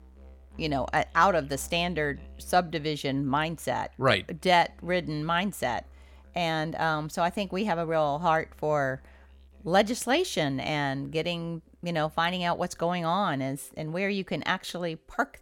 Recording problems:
background music; faint; throughout; 25 dB below the speech

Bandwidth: 17 kHz